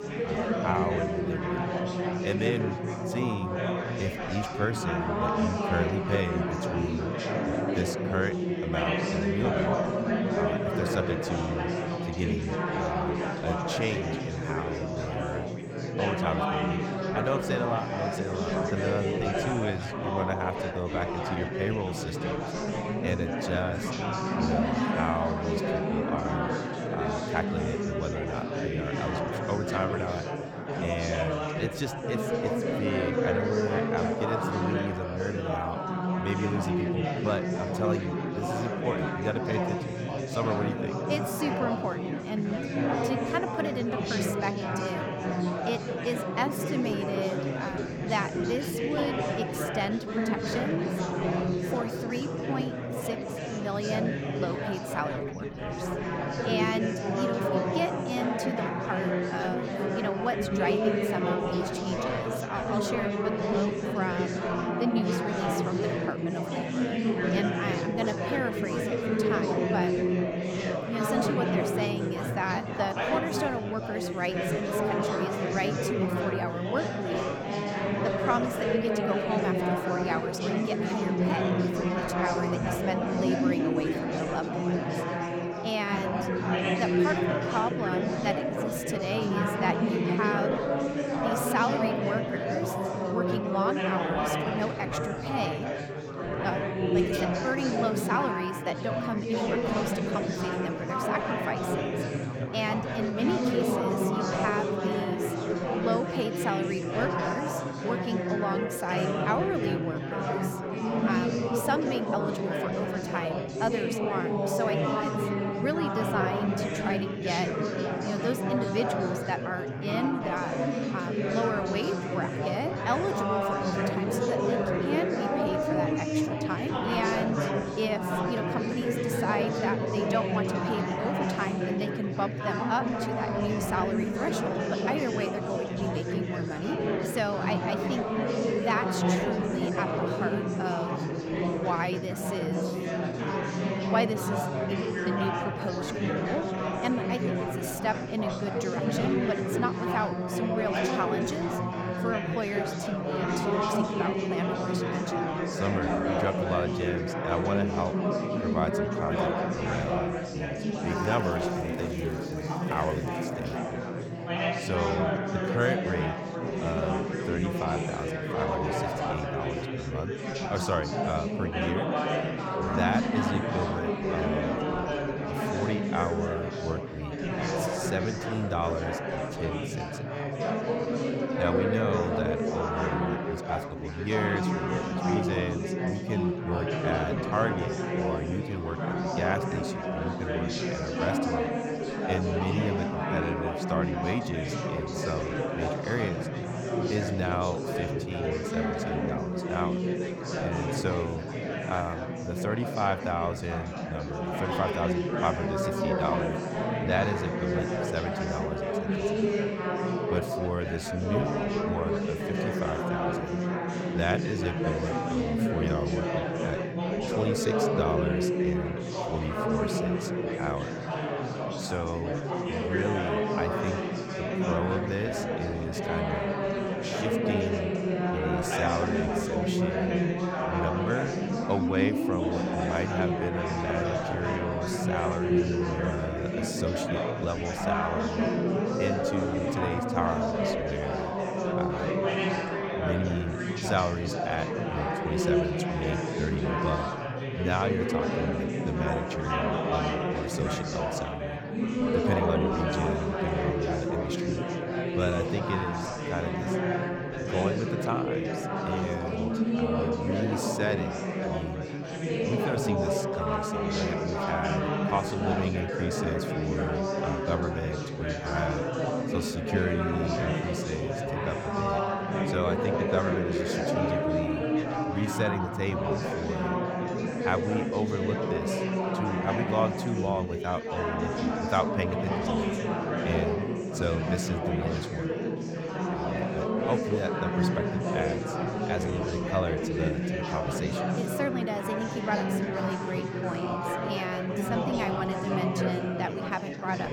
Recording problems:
chatter from many people; very loud; throughout; 4 dB above the speech
crackling; faint; from 2:41 to 2:44; 25 dB below the speech

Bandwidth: 19 kHz